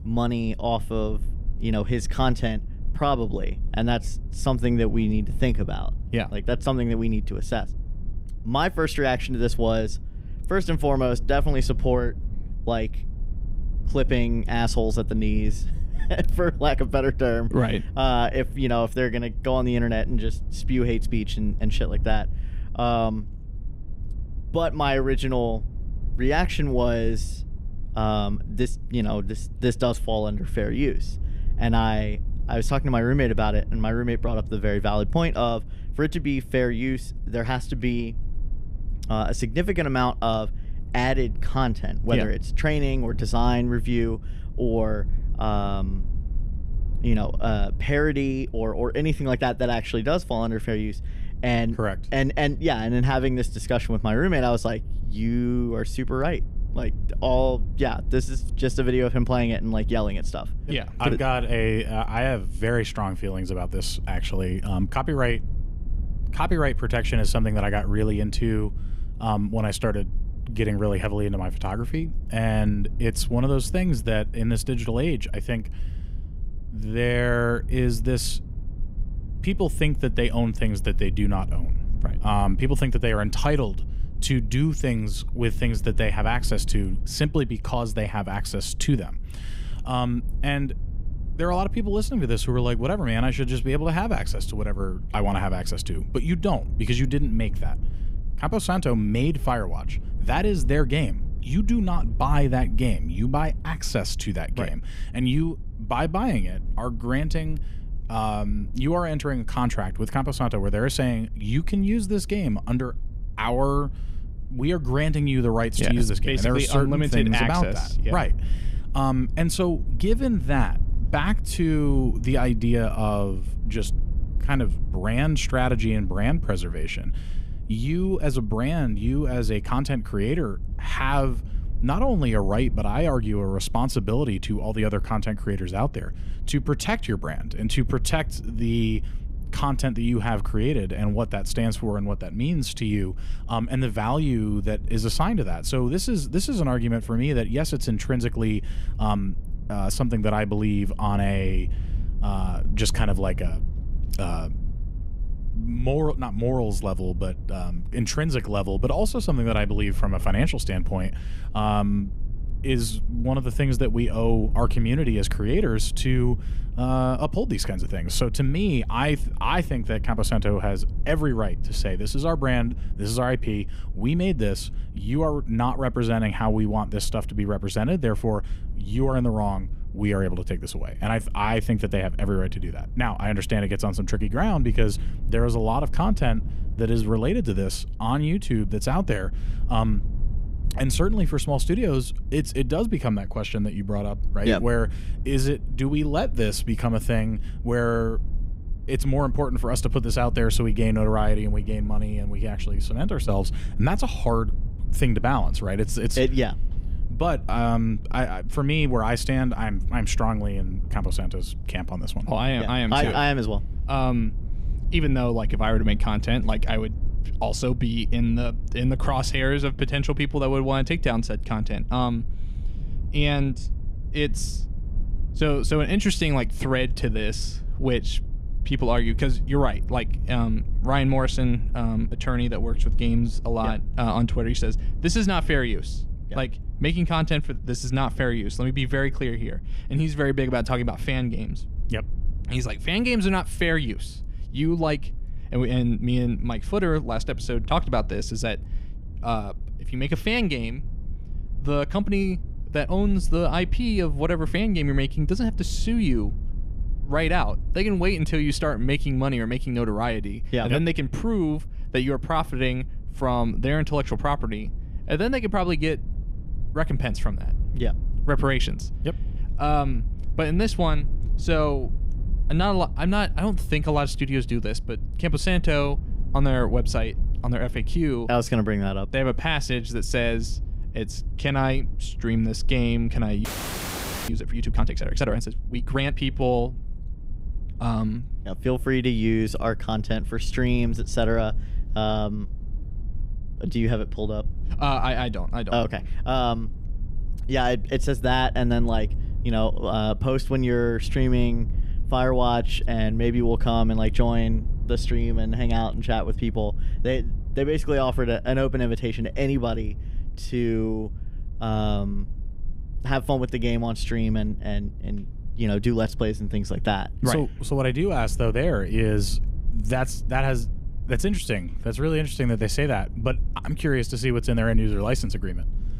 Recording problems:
low rumble; faint; throughout; 20 dB below the speech
audio freezing; at 4:43 for 1 s

